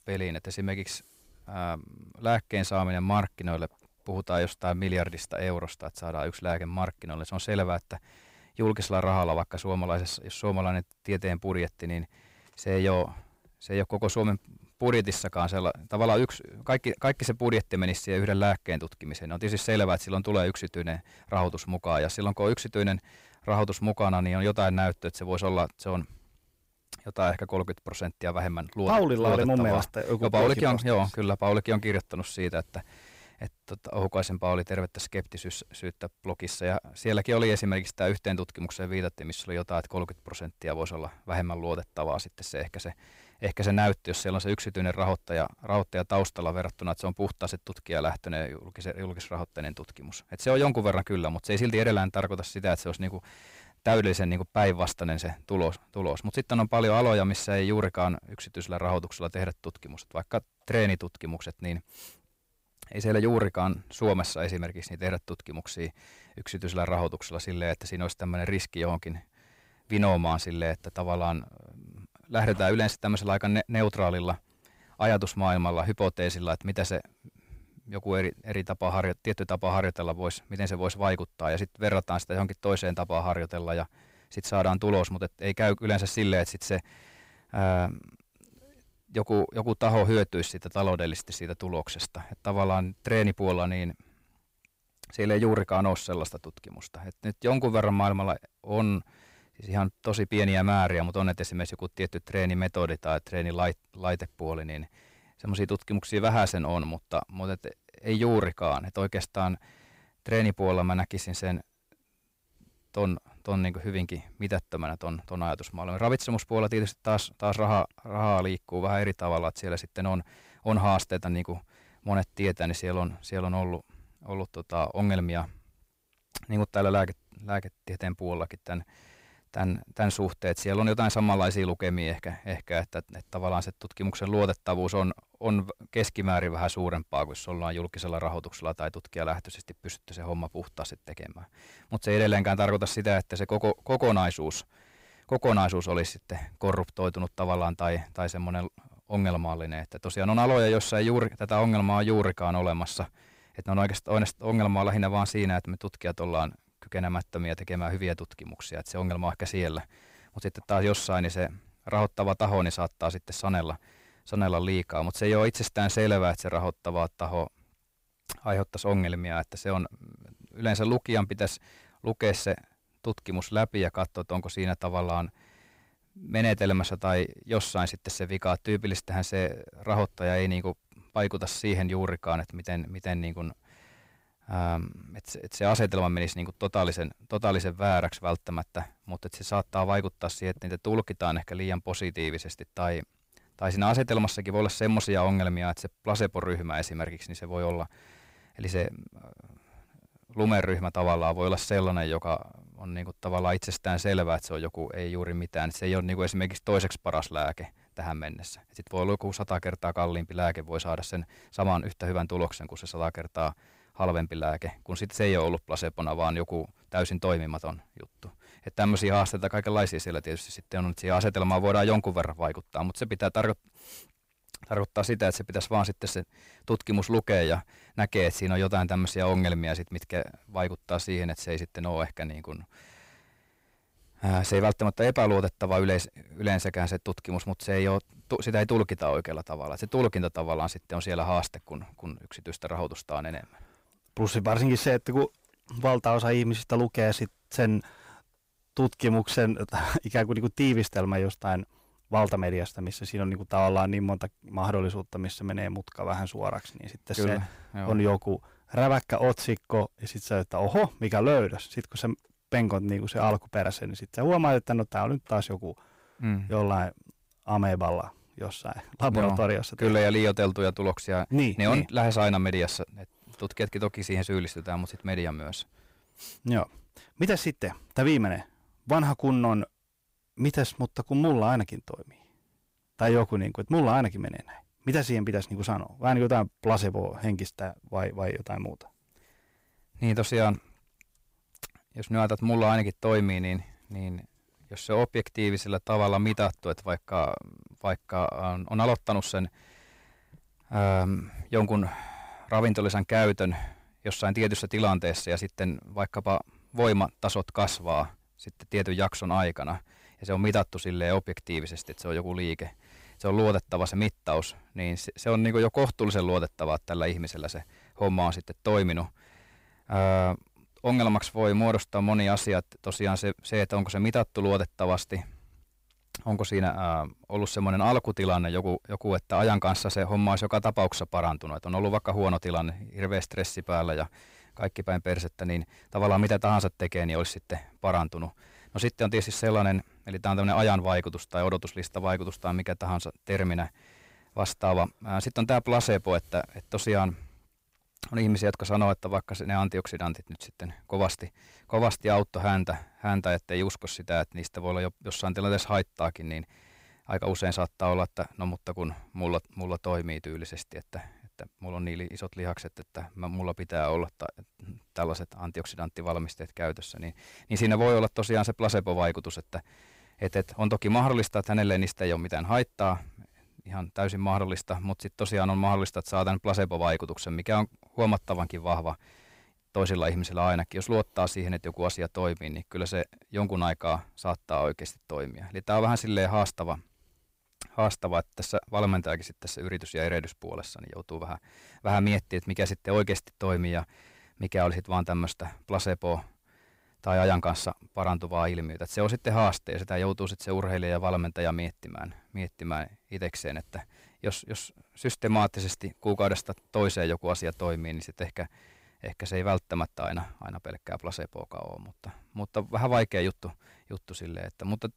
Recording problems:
distortion; slight; 10 dB below the speech

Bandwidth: 15.5 kHz